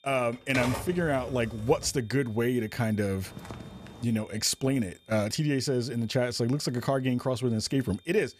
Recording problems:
high-pitched whine; faint; throughout; 3.5 kHz, 30 dB below the speech
keyboard typing; noticeable; until 2 s; peak 4 dB below the speech
footsteps; faint; at 3 s; peak 15 dB below the speech

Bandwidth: 14.5 kHz